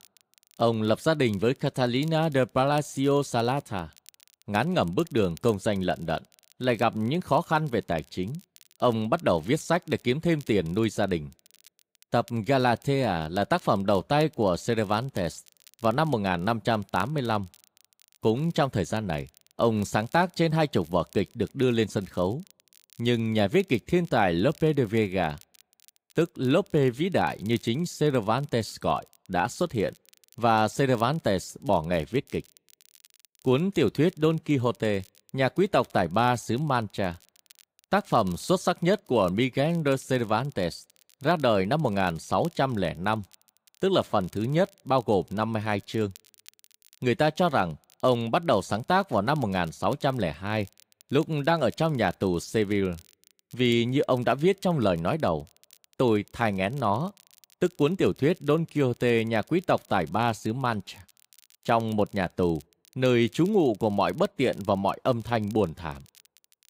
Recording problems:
crackle, like an old record; faint; 30 dB below the speech

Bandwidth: 15.5 kHz